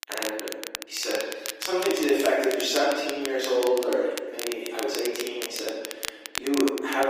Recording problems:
off-mic speech; far
room echo; noticeable; dies away in 1.2 s
thin; somewhat; fading below 300 Hz
garbled, watery; slightly; nothing above 15 kHz
crackle, like an old record; loud; 8 dB below the speech
abrupt cut into speech; at the end

